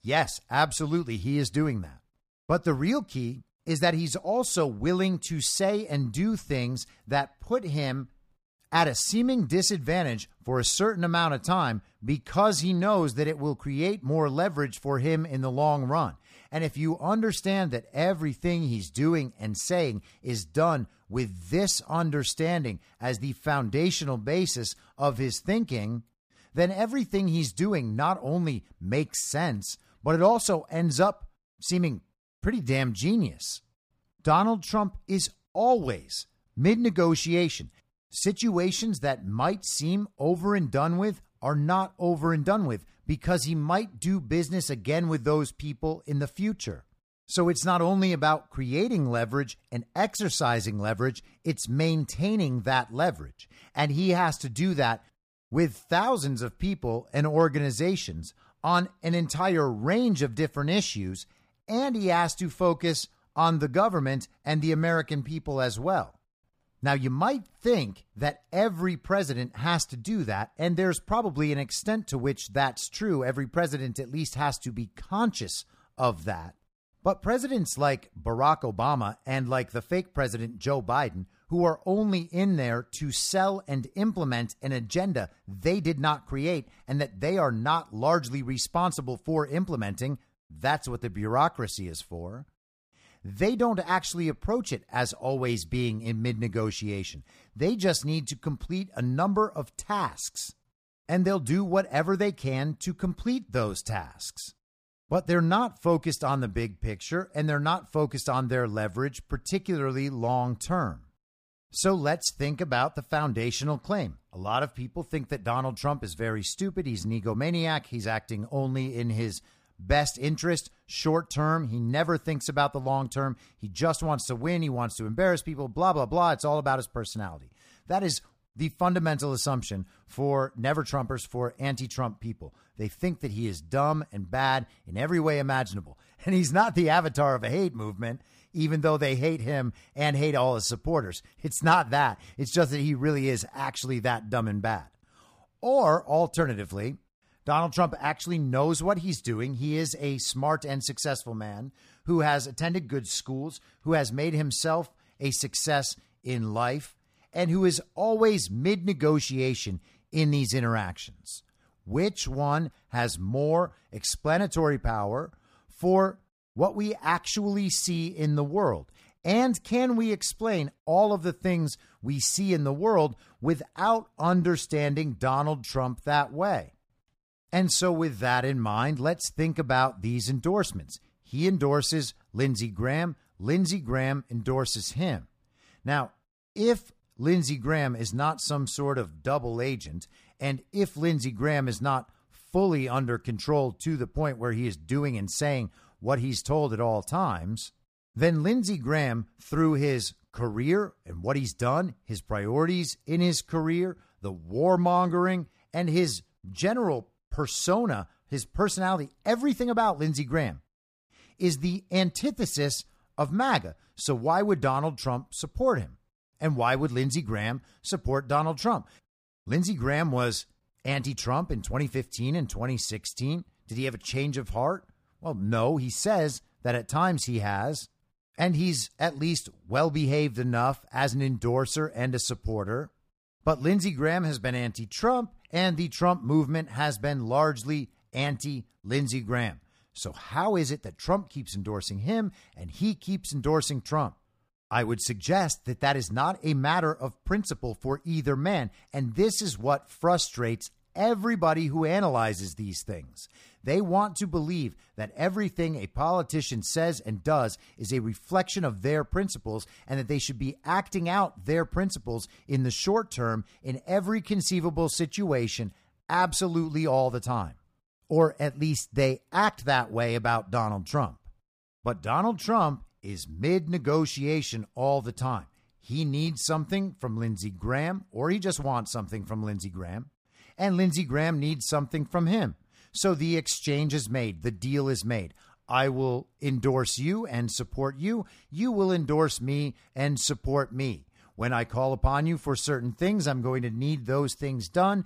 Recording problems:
none

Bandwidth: 15 kHz